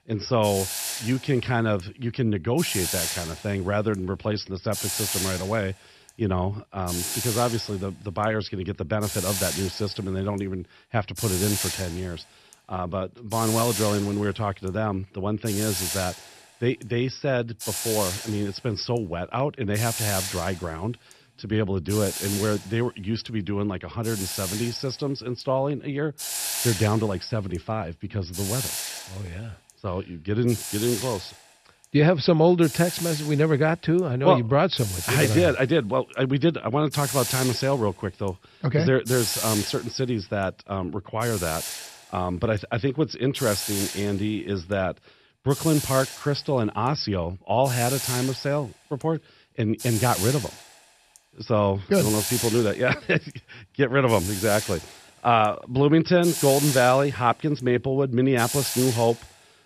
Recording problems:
high frequencies cut off; noticeable; nothing above 5.5 kHz
hiss; loud; throughout; 5 dB below the speech

